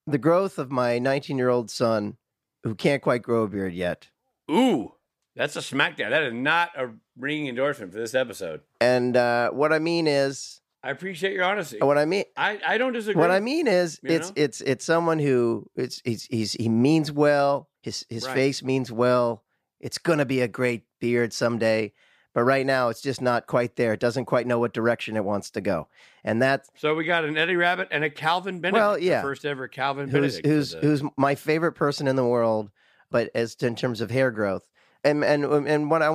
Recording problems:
abrupt cut into speech; at the end

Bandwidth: 15 kHz